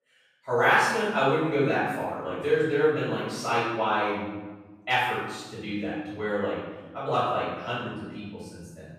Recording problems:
room echo; strong; dies away in 1.2 s
off-mic speech; far

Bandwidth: 15 kHz